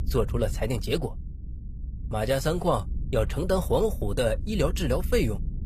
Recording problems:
low rumble; faint; throughout; 20 dB below the speech

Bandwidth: 14.5 kHz